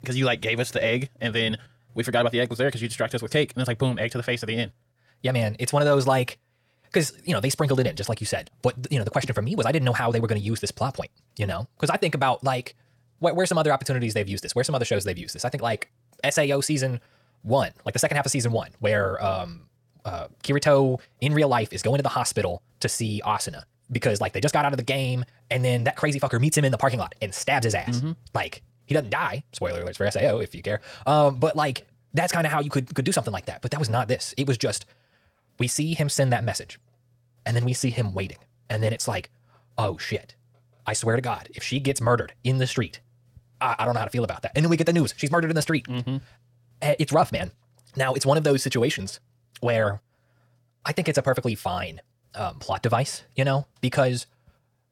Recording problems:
wrong speed, natural pitch; too fast; 1.6 times normal speed

